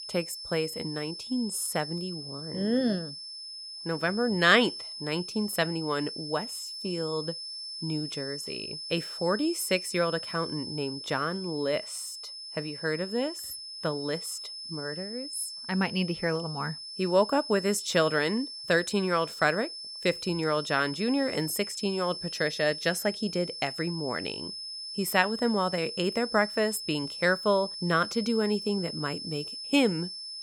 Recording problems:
high-pitched whine; loud; throughout; 5.5 kHz, 8 dB below the speech

